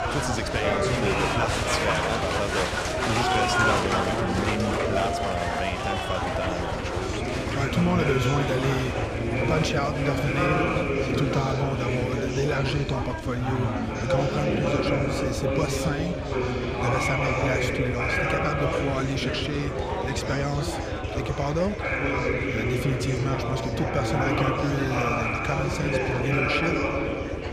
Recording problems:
murmuring crowd; very loud; throughout; 3 dB above the speech
background music; faint; throughout; 25 dB below the speech
low rumble; faint; throughout; 20 dB below the speech

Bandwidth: 15 kHz